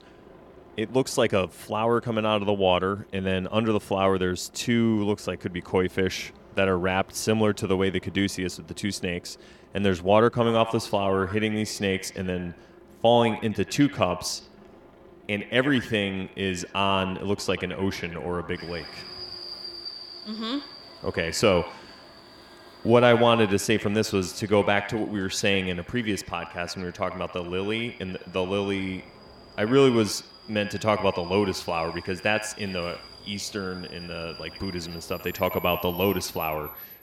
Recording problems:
echo of what is said; noticeable; from 10 s on; 80 ms later, 15 dB below the speech
train or aircraft noise; noticeable; throughout; 20 dB below the speech

